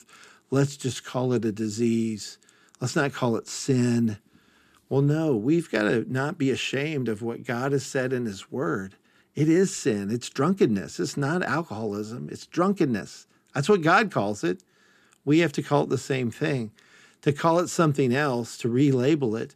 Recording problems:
none

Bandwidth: 14.5 kHz